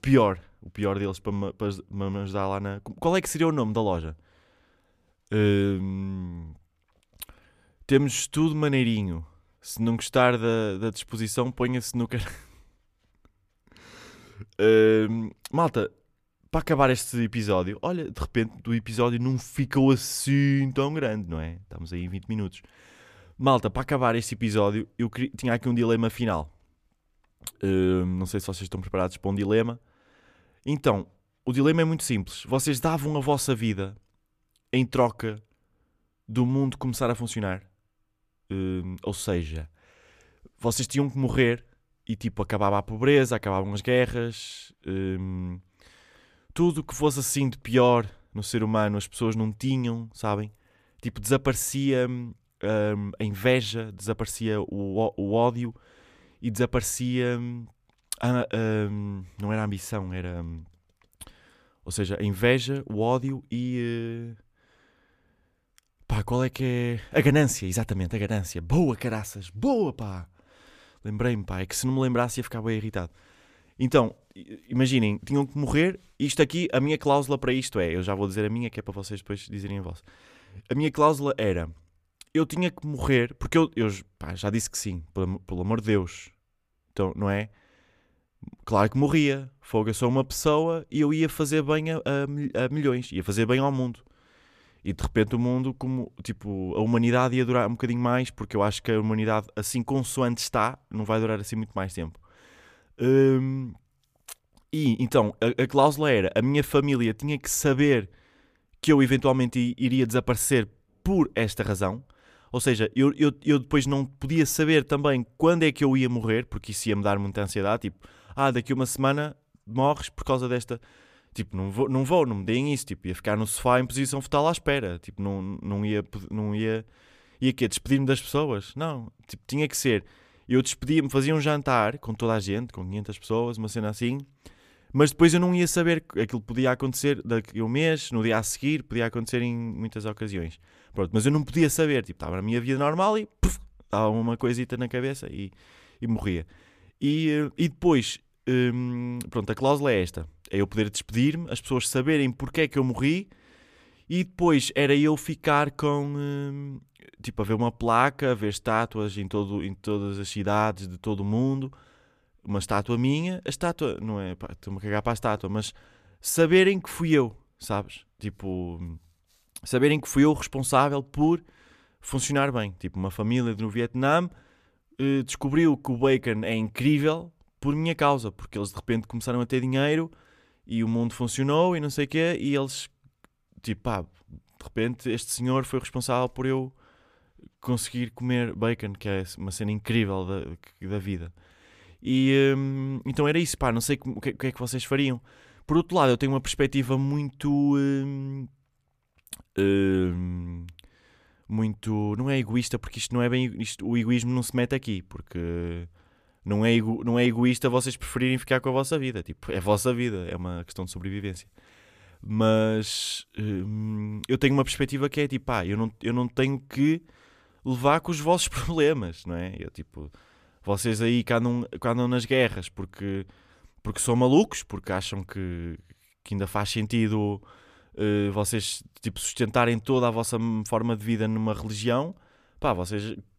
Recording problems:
none

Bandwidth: 14.5 kHz